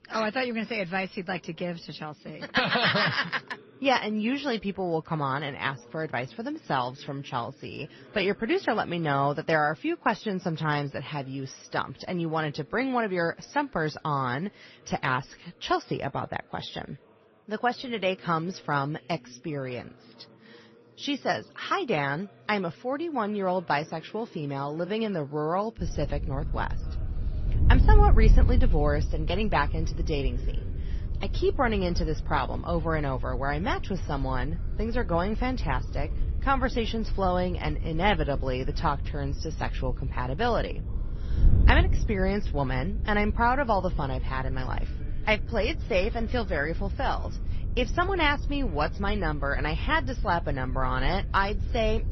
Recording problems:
garbled, watery; slightly; nothing above 6 kHz
wind noise on the microphone; occasional gusts; from 26 s on; 20 dB below the speech
chatter from many people; faint; throughout; 25 dB below the speech

